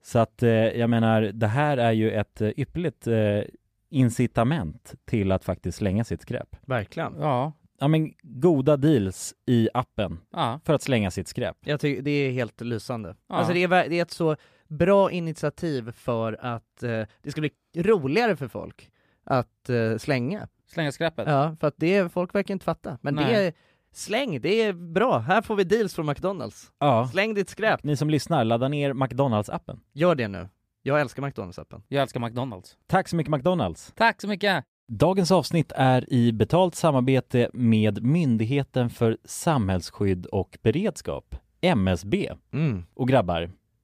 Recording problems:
none

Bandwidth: 15 kHz